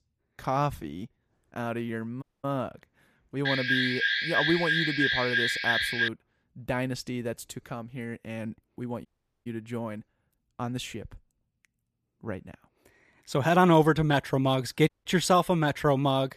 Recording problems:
audio cutting out; at 2 s, at 9 s and at 15 s
alarm; loud; from 3.5 to 6 s; peak 4 dB above the speech

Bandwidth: 14.5 kHz